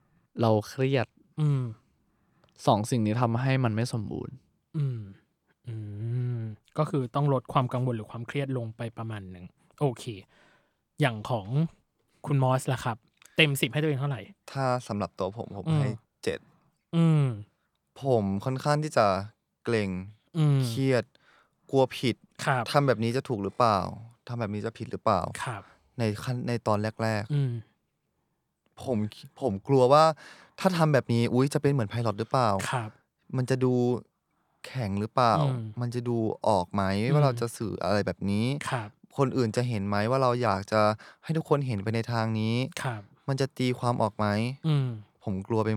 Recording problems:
abrupt cut into speech; at the end

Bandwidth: 18.5 kHz